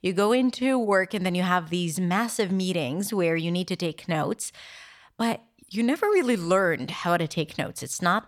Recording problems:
none

